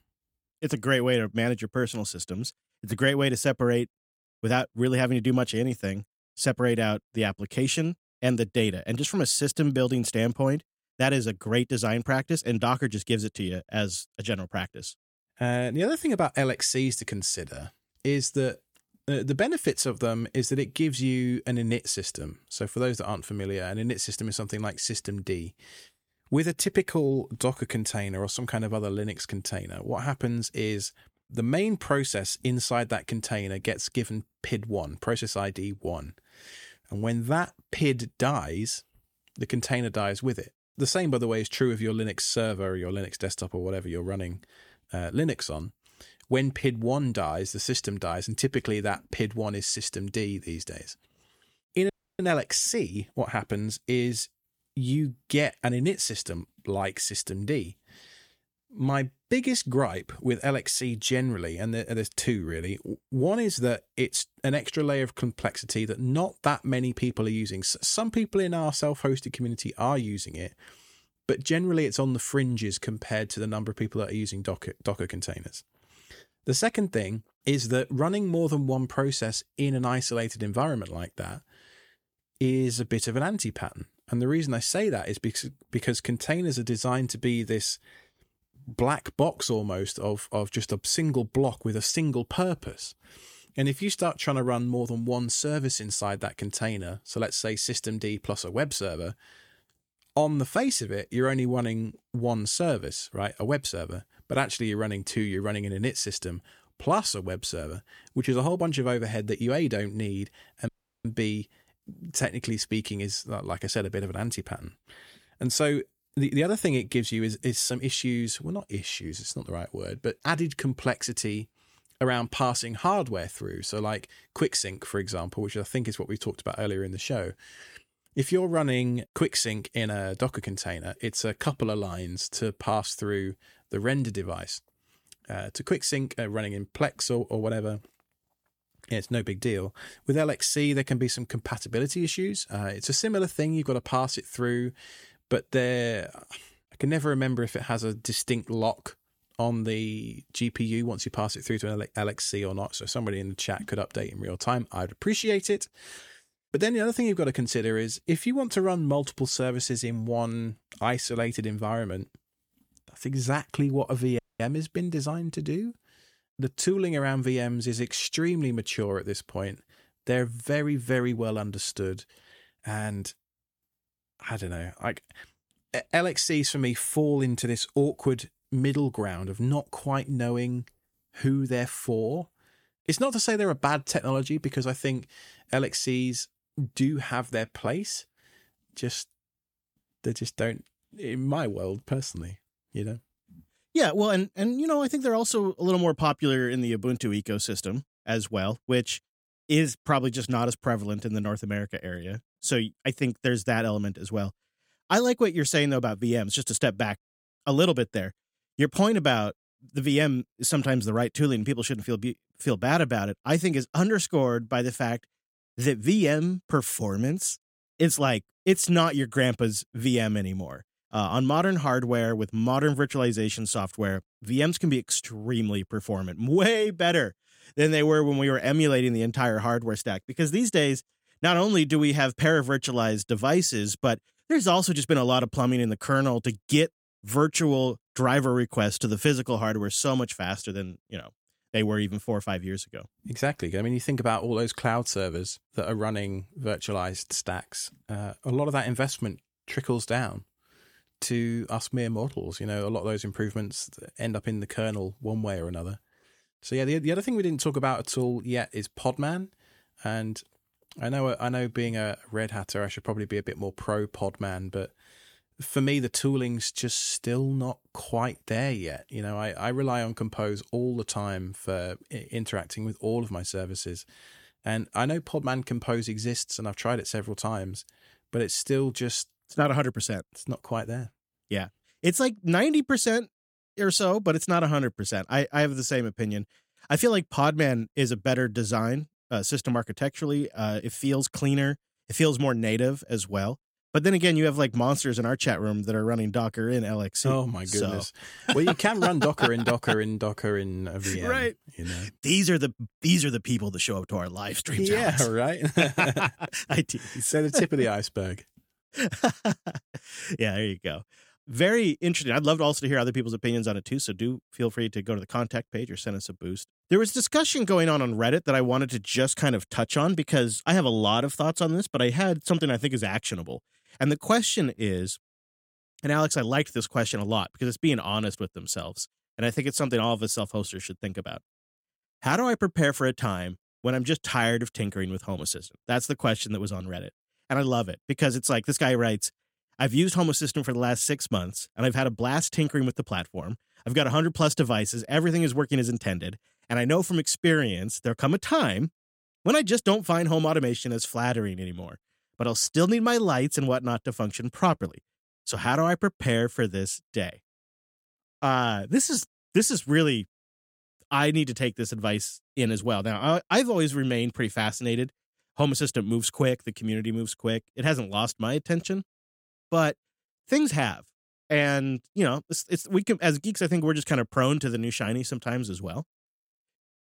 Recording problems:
audio cutting out; at 52 s, at 1:51 and at 2:44

